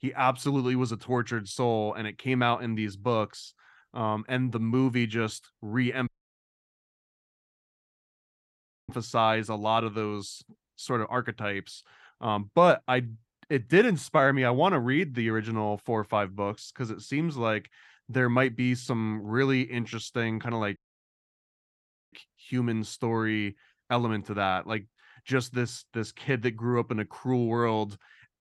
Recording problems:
audio cutting out; at 6 s for 3 s and at 21 s for 1.5 s

